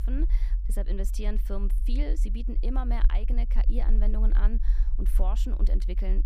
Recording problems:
low rumble; noticeable; throughout; 10 dB below the speech

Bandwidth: 14.5 kHz